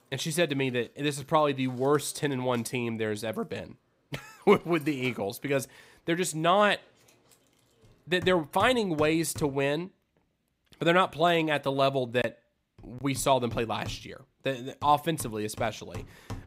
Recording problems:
machinery noise; faint; throughout; 20 dB below the speech

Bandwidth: 15.5 kHz